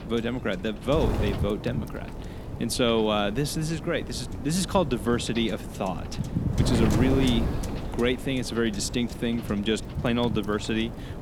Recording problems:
wind noise on the microphone; heavy; 9 dB below the speech

